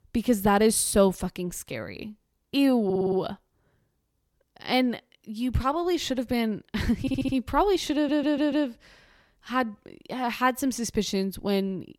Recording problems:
audio stuttering; at 3 s, at 7 s and at 8 s

